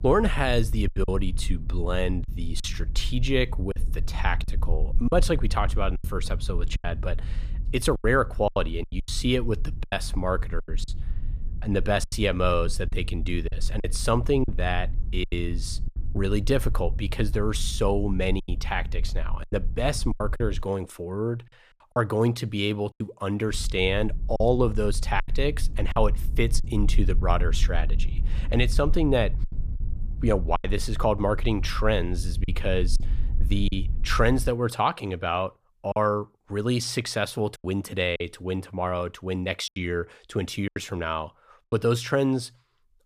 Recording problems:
low rumble; faint; until 21 s and from 23 to 35 s; 20 dB below the speech
choppy; very; 6% of the speech affected

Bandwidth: 14.5 kHz